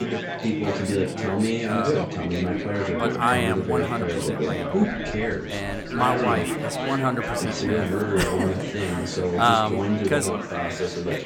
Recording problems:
chatter from many people; very loud; throughout; 2 dB above the speech
animal sounds; noticeable; from 4 s on; 15 dB below the speech

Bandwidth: 18 kHz